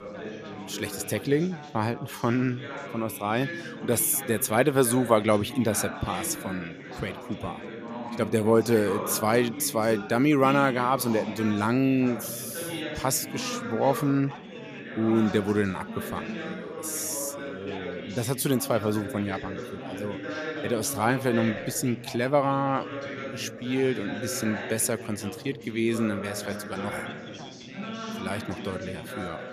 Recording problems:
background chatter; loud; throughout; 4 voices, 10 dB below the speech

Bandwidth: 14.5 kHz